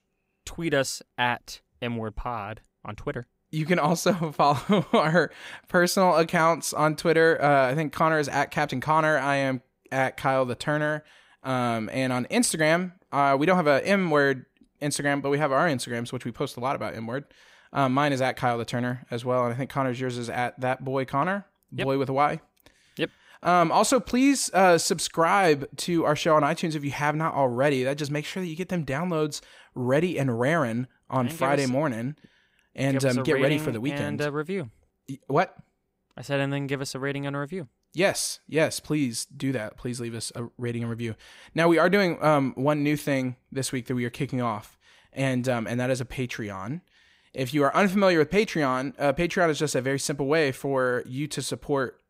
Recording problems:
none

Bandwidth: 15.5 kHz